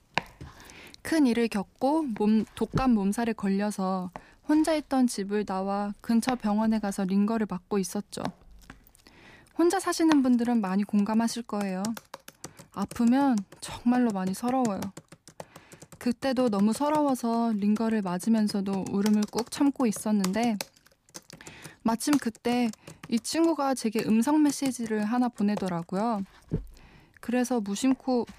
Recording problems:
household noises; noticeable; throughout; 15 dB below the speech

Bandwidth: 15 kHz